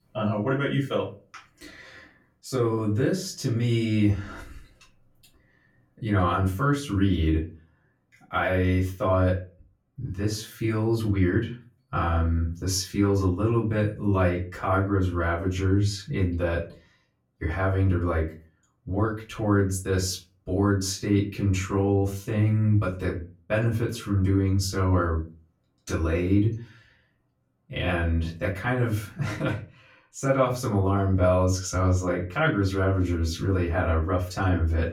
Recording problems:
off-mic speech; far
room echo; very slight; dies away in 0.3 s

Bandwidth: 17.5 kHz